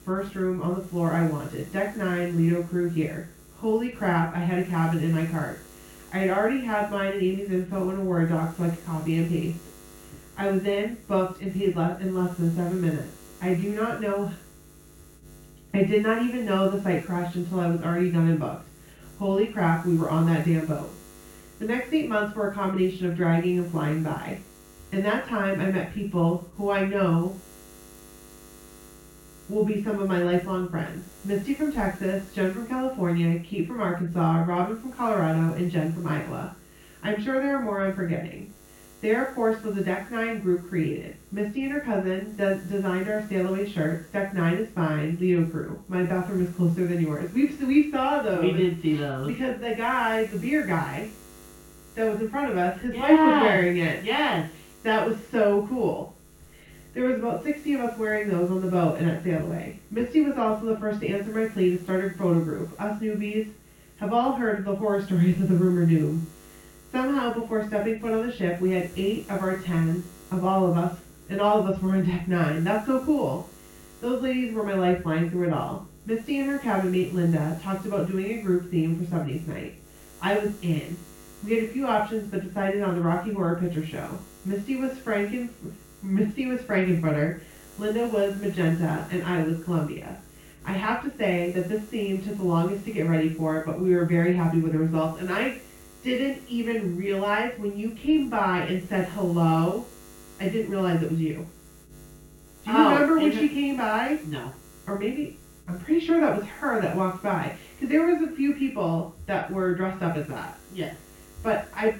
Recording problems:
off-mic speech; far
muffled; very; fading above 3 kHz
room echo; noticeable; dies away in 0.3 s
electrical hum; faint; throughout; 60 Hz, 25 dB below the speech

